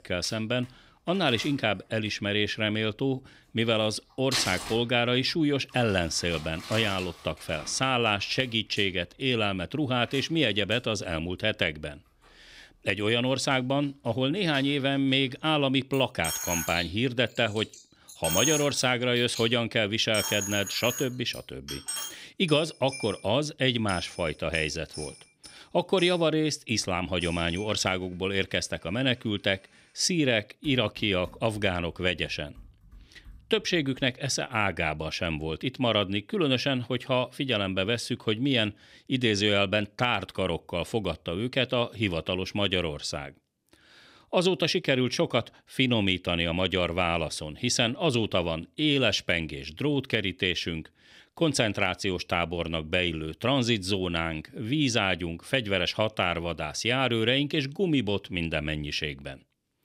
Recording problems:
household noises; loud; until 34 s; 9 dB below the speech

